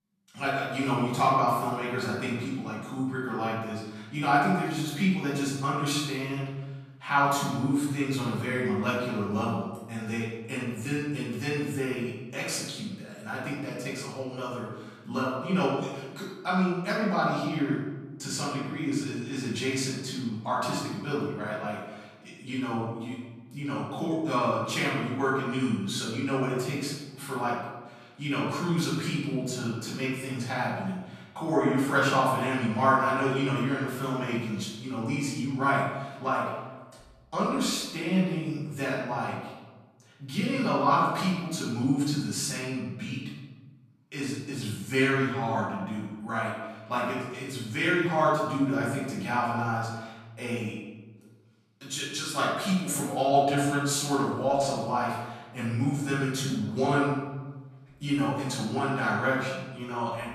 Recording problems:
off-mic speech; far
room echo; noticeable; dies away in 1 s

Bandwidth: 14.5 kHz